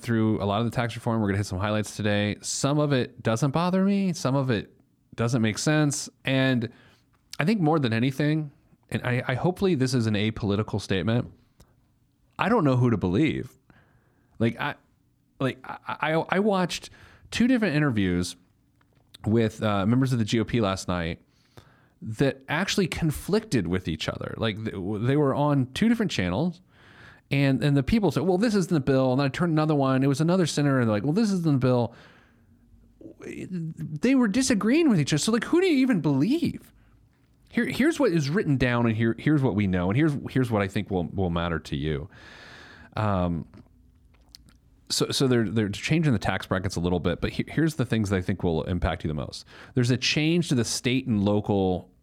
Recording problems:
none

